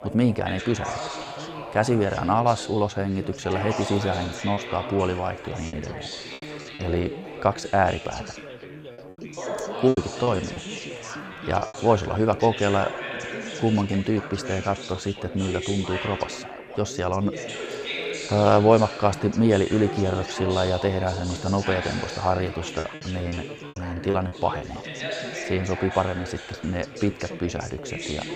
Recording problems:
background chatter; loud; throughout; 4 voices, 9 dB below the speech
choppy; very; from 4.5 to 7 s, from 10 to 12 s and from 23 to 25 s; 10% of the speech affected

